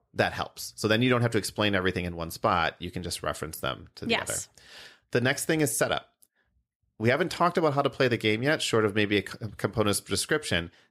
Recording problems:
none

